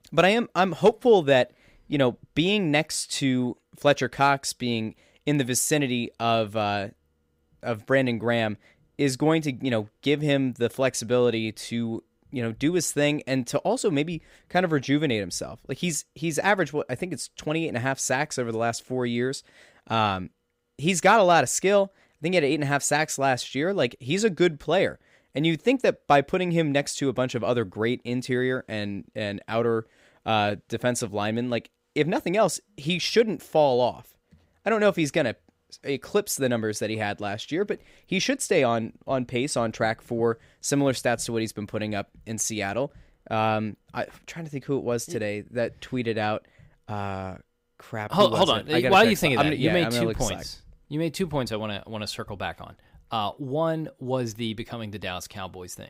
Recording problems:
none

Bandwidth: 15.5 kHz